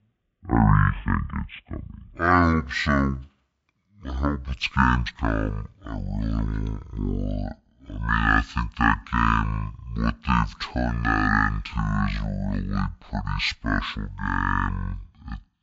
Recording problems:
wrong speed and pitch; too slow and too low; 0.5 times normal speed

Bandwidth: 7.5 kHz